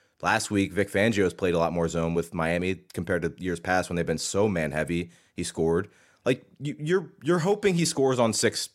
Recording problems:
none

